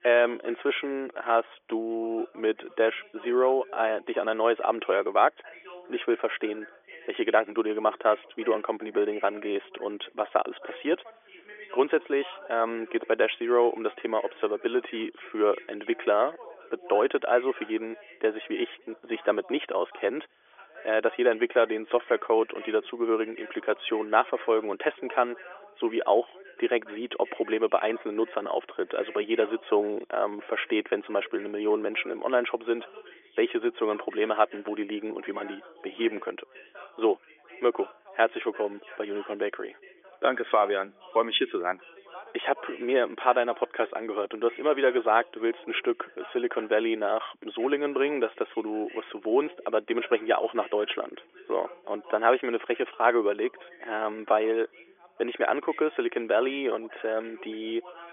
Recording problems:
phone-call audio; nothing above 3.5 kHz
background chatter; faint; throughout; 2 voices, 20 dB below the speech

